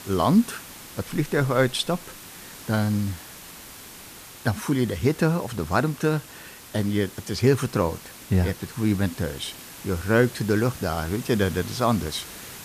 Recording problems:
hiss; noticeable; throughout; 15 dB below the speech

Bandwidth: 14.5 kHz